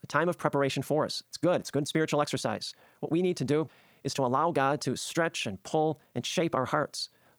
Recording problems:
wrong speed, natural pitch; too fast; 1.6 times normal speed

